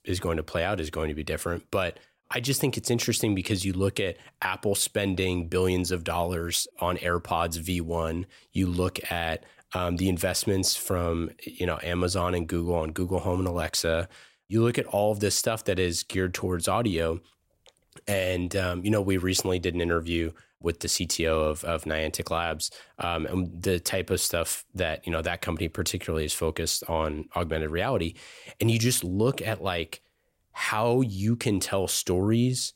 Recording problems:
none

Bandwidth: 16 kHz